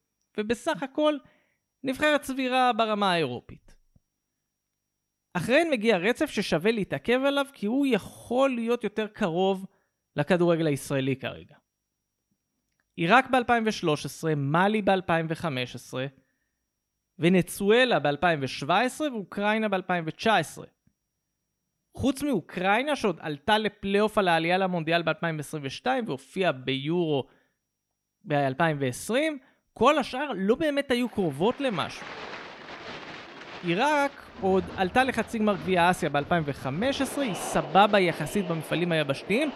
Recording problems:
crowd noise; noticeable; from 31 s on; 15 dB below the speech

